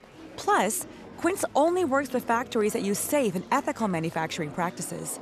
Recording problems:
murmuring crowd; noticeable; throughout; 20 dB below the speech

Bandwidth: 13.5 kHz